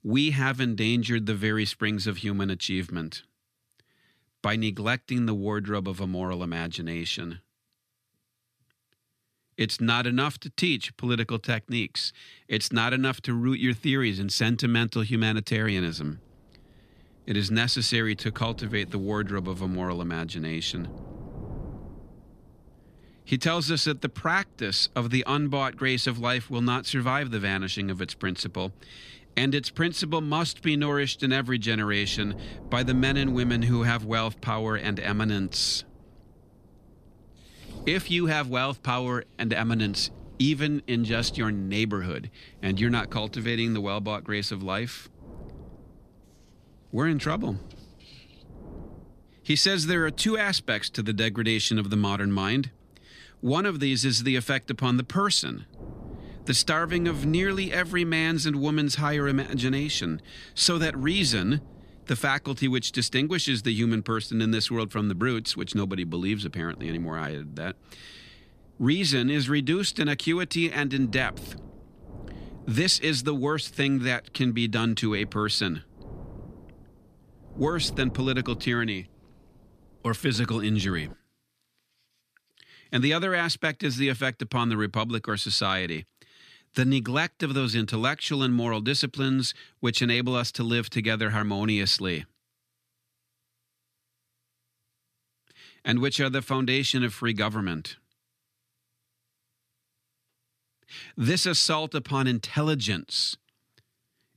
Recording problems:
wind noise on the microphone; occasional gusts; from 16 s to 1:21; 25 dB below the speech

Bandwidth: 14.5 kHz